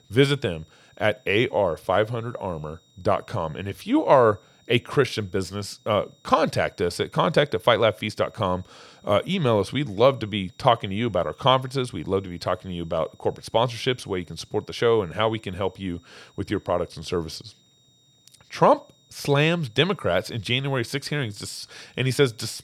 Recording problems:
high-pitched whine; faint; throughout; 3.5 kHz, 35 dB below the speech

